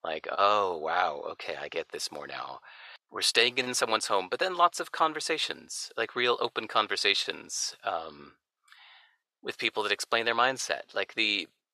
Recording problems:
thin; very; fading below 600 Hz

